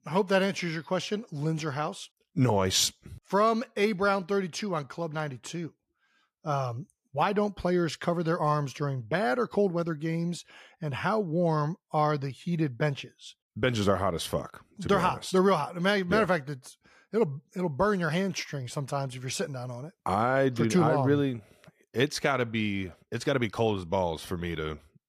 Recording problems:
none

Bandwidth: 14.5 kHz